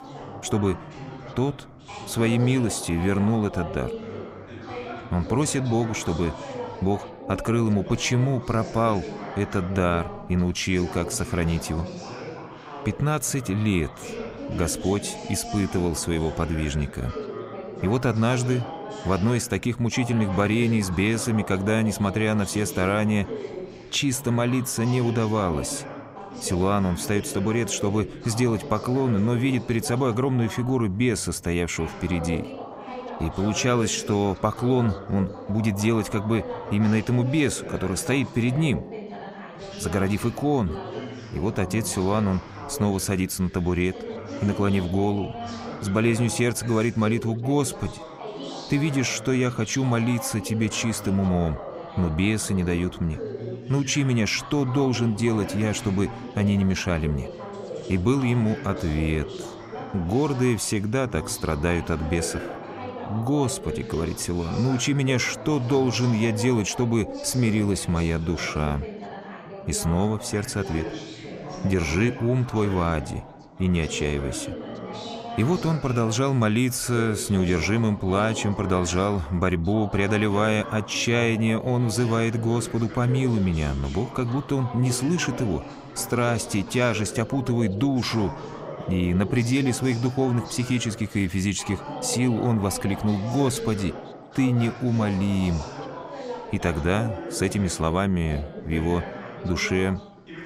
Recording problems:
background chatter; noticeable; throughout; 4 voices, 10 dB below the speech

